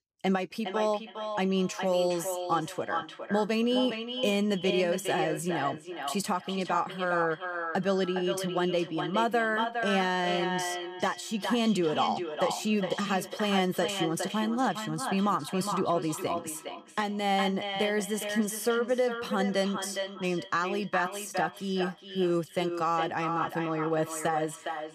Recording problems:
echo of what is said; strong; throughout; 410 ms later, 6 dB below the speech

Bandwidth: 14.5 kHz